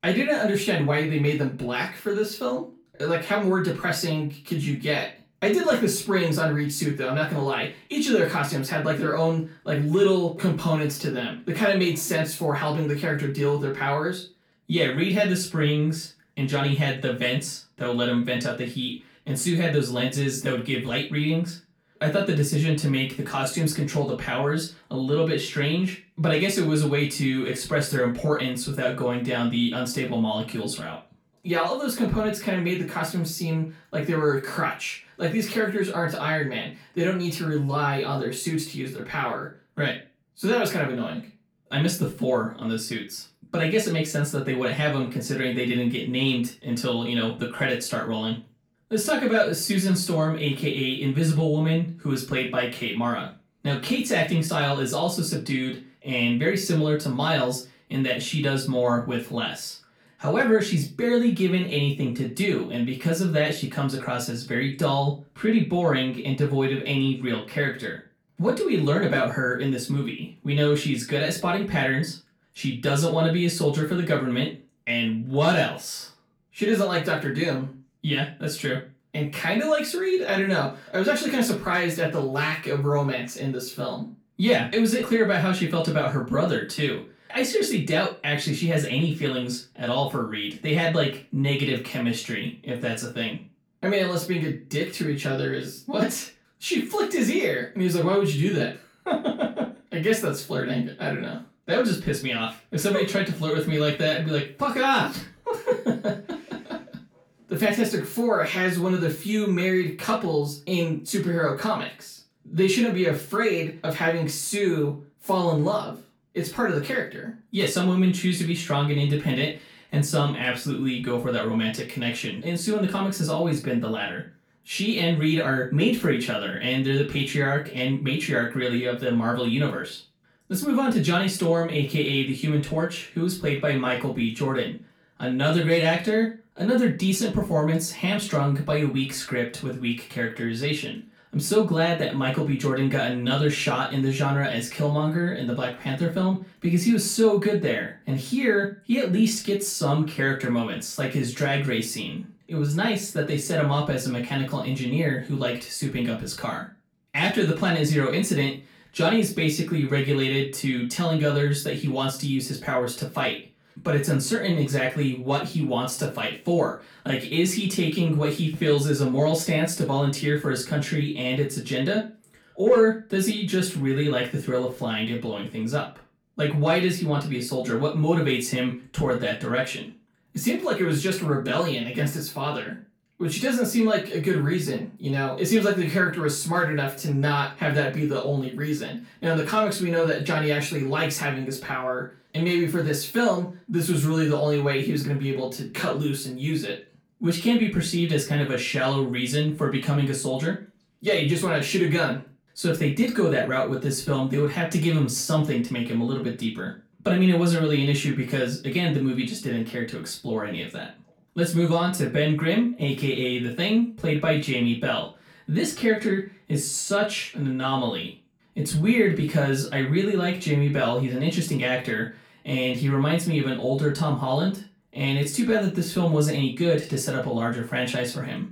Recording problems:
off-mic speech; far
room echo; slight; dies away in 0.3 s

